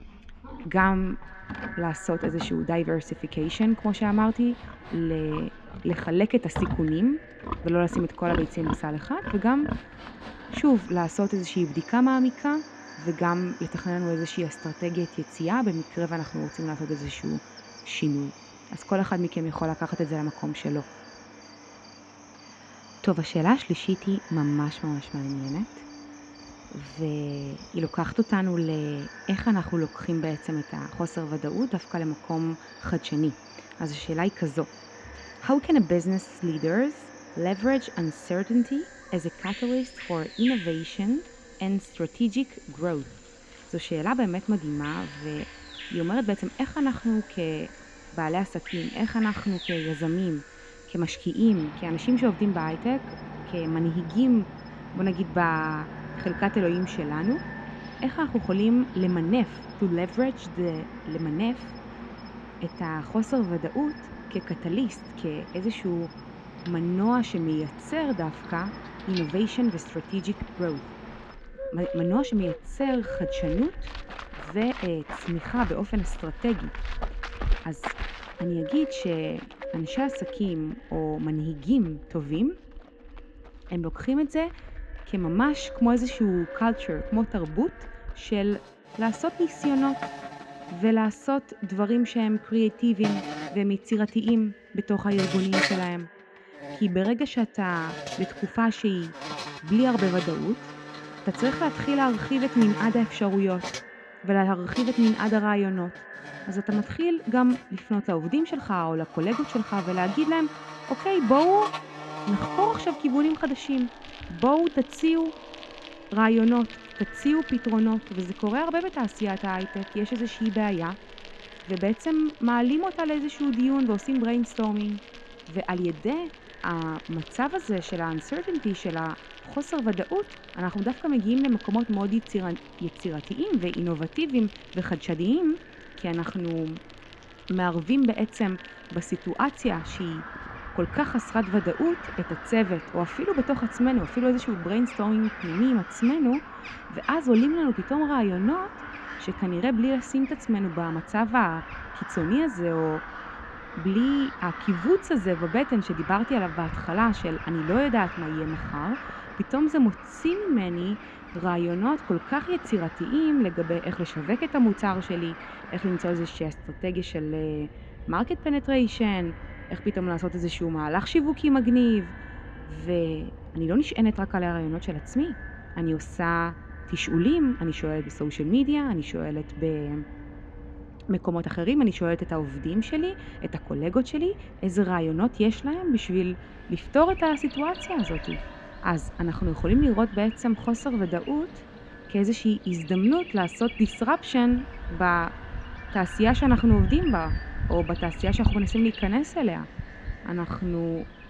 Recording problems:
muffled; very; fading above 4 kHz
echo of what is said; faint; throughout; 240 ms later, 20 dB below the speech
animal sounds; noticeable; throughout; 15 dB below the speech

